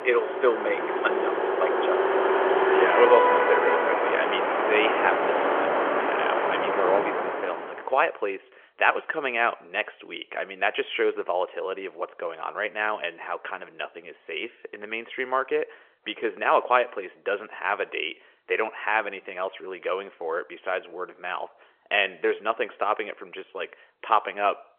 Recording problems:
phone-call audio; nothing above 3 kHz
traffic noise; very loud; until 7.5 s; 4 dB above the speech

